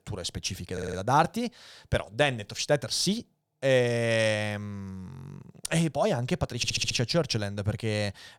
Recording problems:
audio stuttering; at 0.5 s and at 6.5 s

